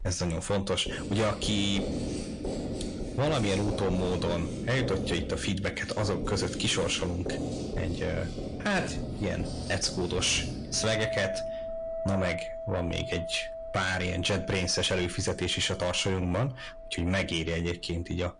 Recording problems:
distortion; heavy; 7 dB below the speech
garbled, watery; slightly; nothing above 10 kHz
household noises; loud; throughout; 6 dB below the speech

